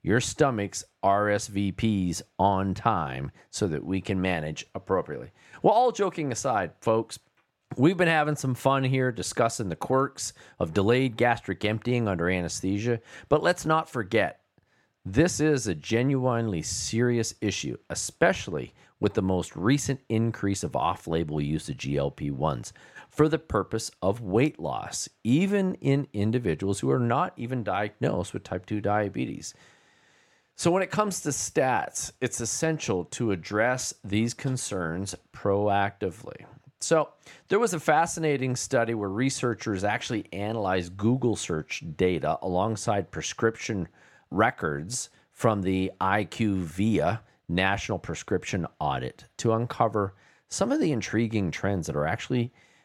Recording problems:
none

